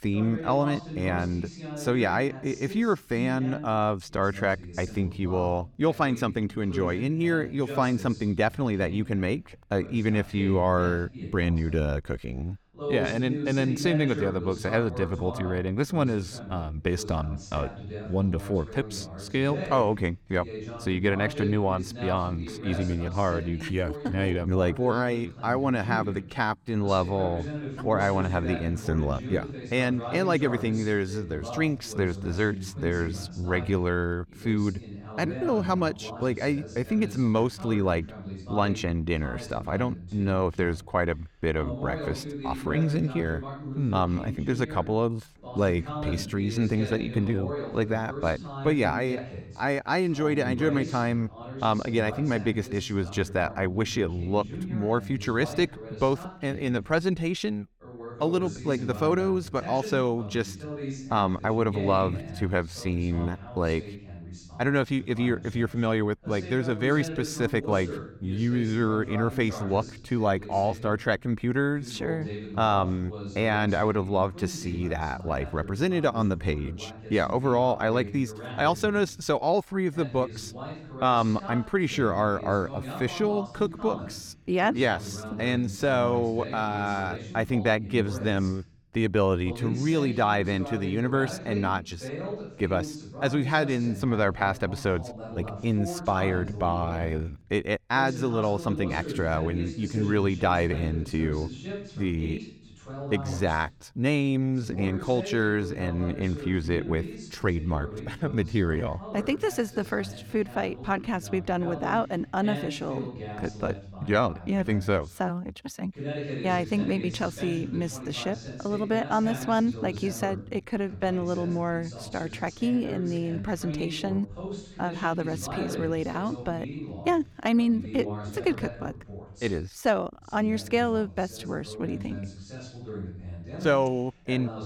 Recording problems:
voice in the background; noticeable; throughout; 10 dB below the speech

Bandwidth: 17.5 kHz